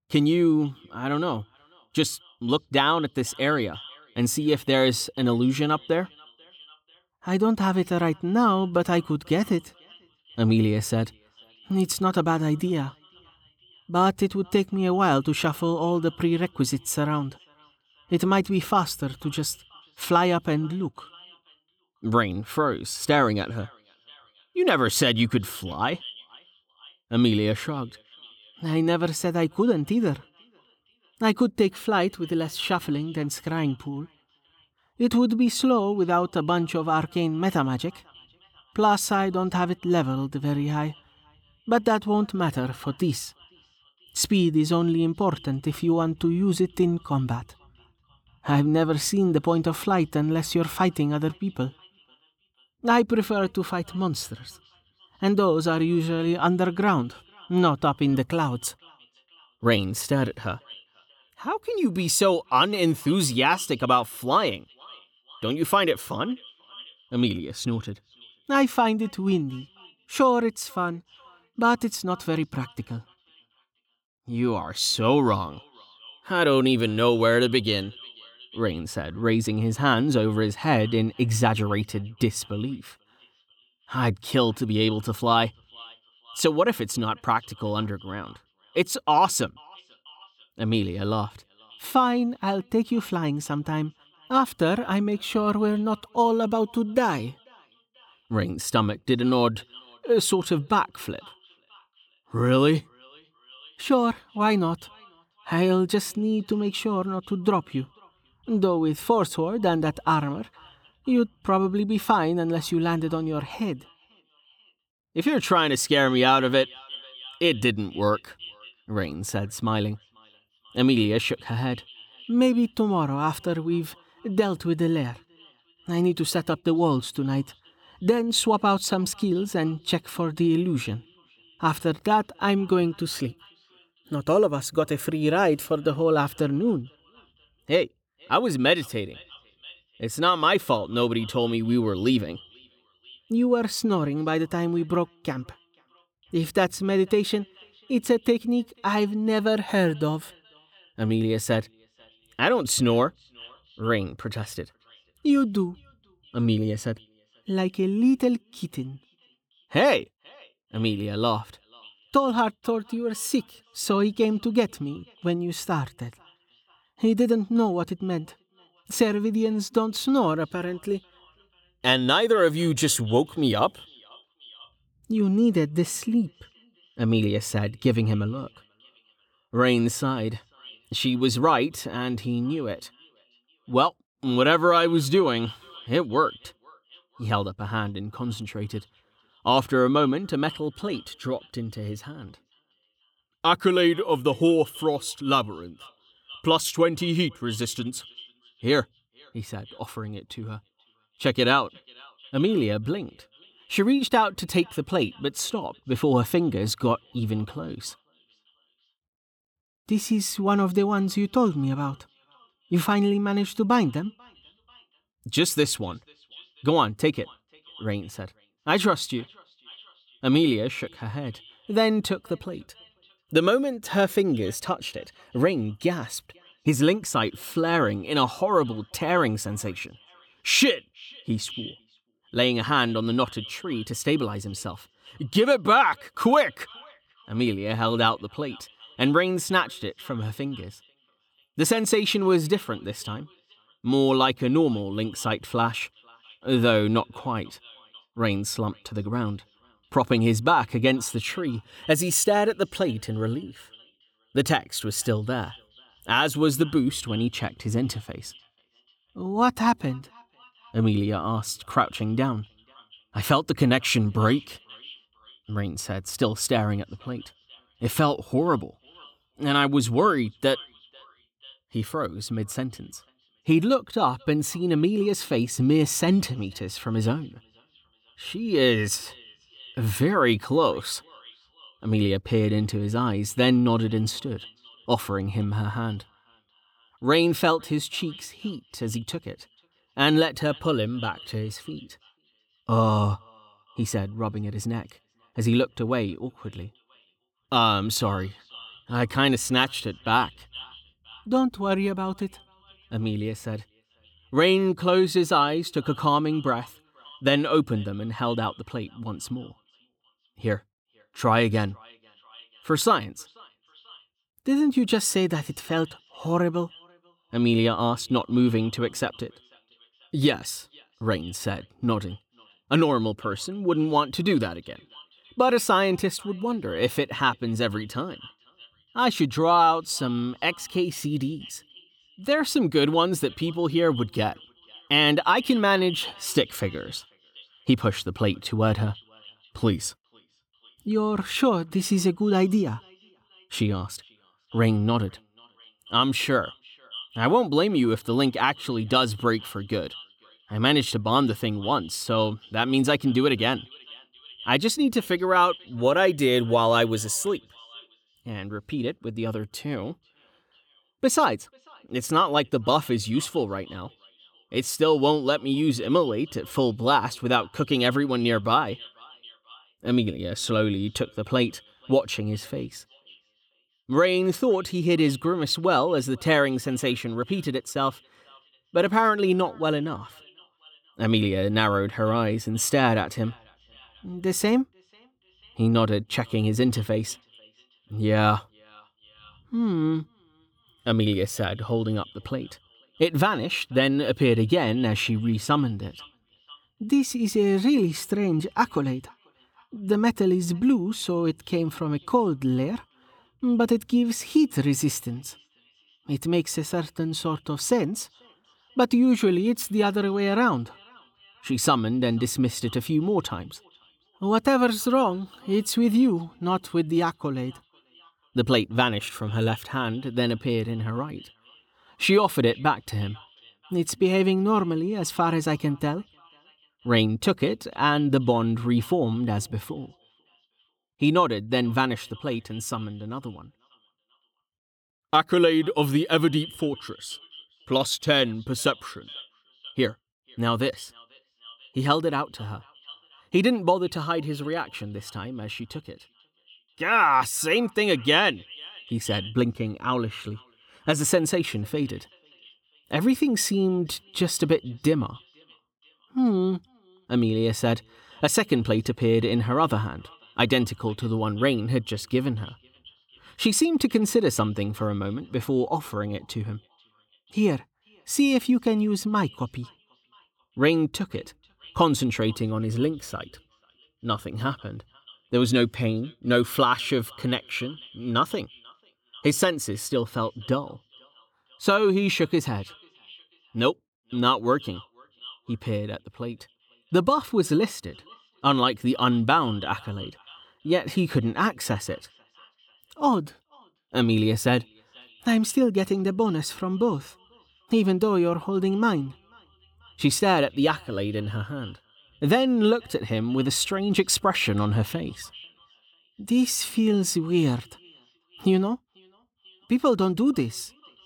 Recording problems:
echo of what is said; faint; throughout; 490 ms later, 25 dB below the speech

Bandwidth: 18.5 kHz